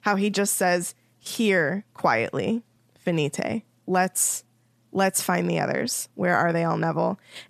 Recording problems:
none

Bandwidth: 14 kHz